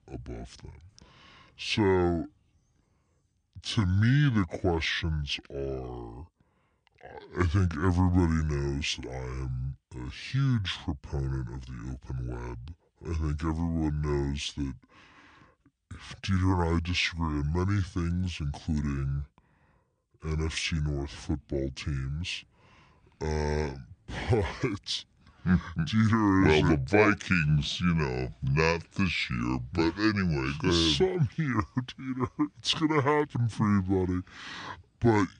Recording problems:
wrong speed and pitch; too slow and too low; 0.6 times normal speed

